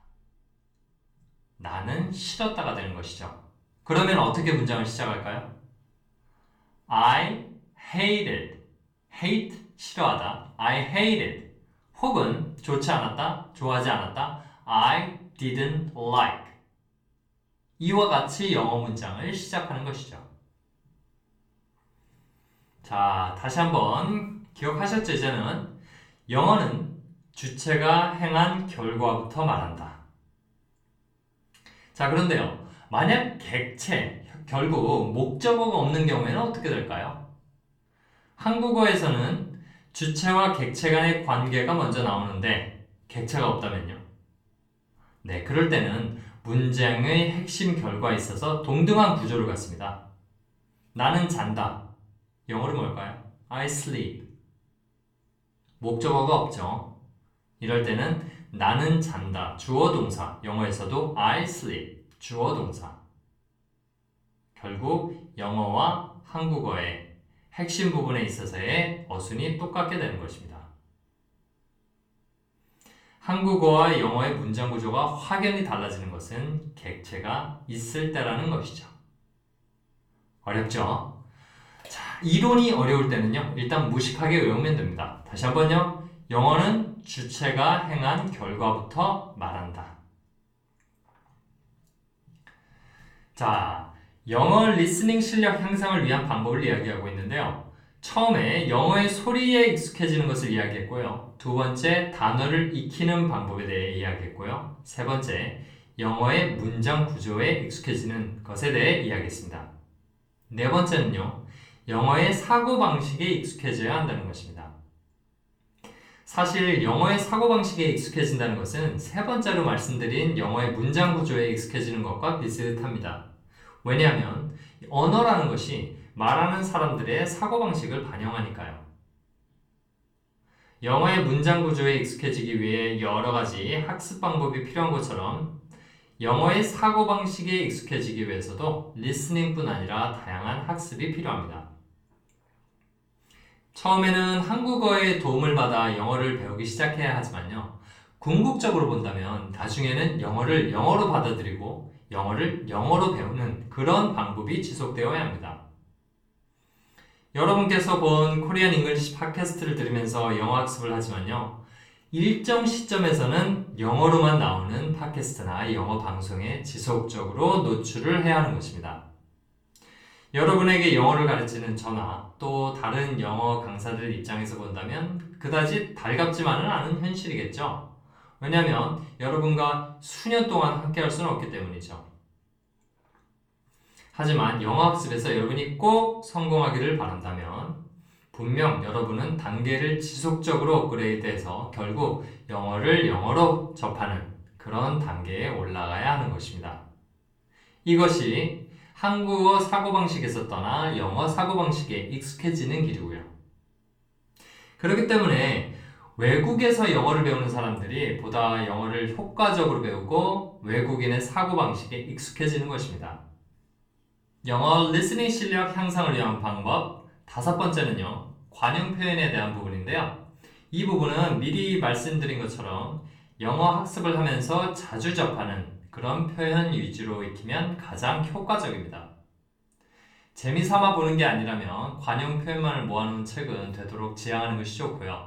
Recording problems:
off-mic speech; far
room echo; slight; dies away in 0.4 s

